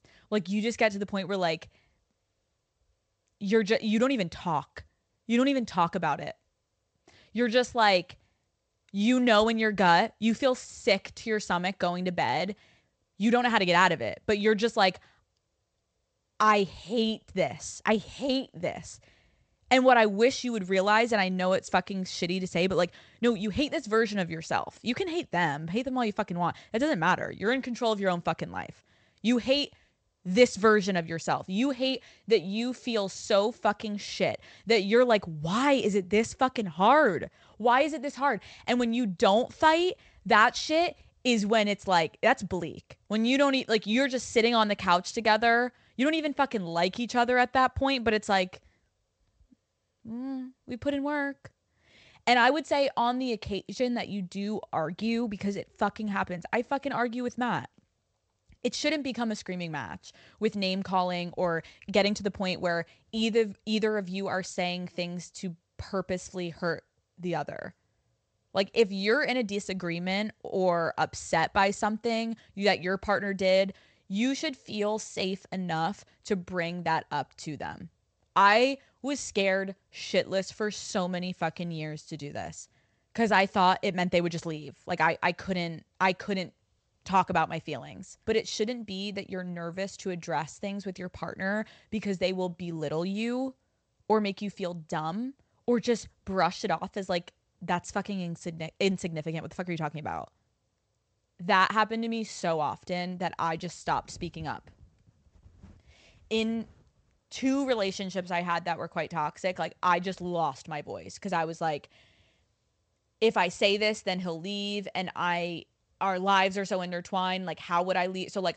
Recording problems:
garbled, watery; slightly; nothing above 8 kHz

